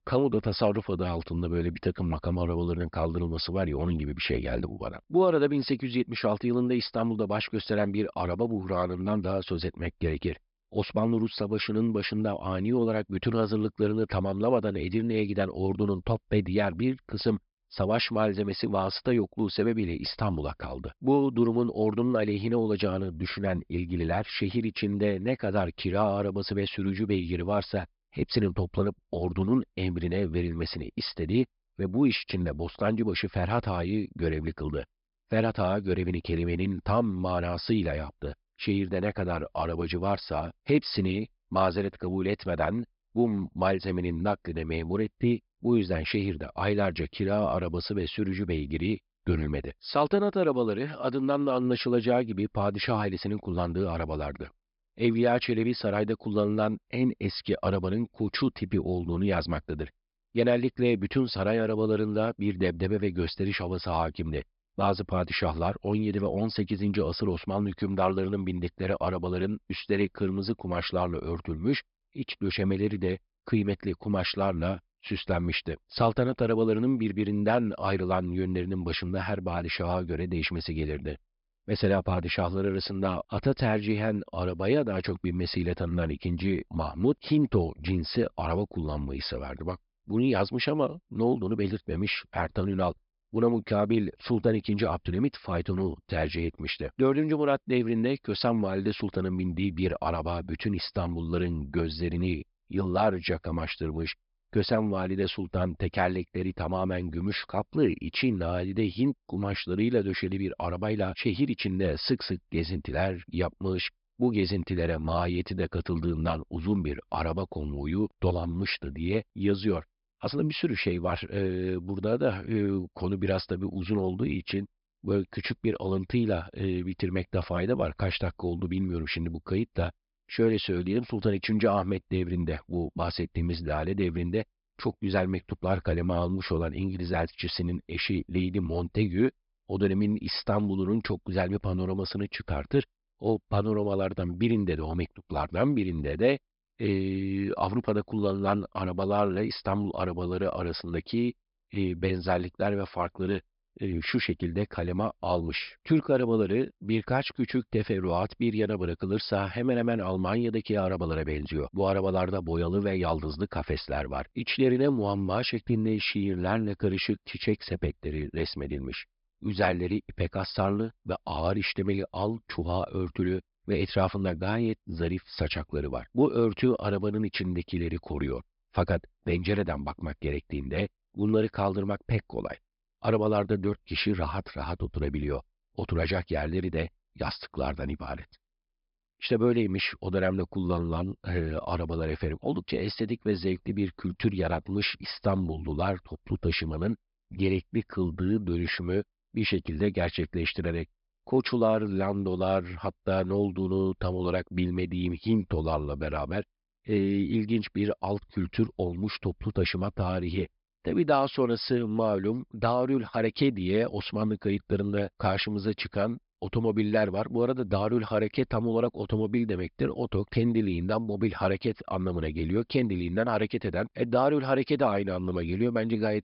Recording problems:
high frequencies cut off; noticeable; nothing above 5.5 kHz

